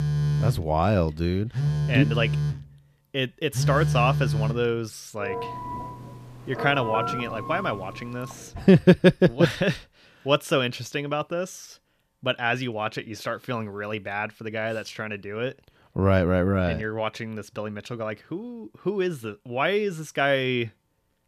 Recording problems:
alarms or sirens; loud; until 8.5 s; 2 dB below the speech

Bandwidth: 14.5 kHz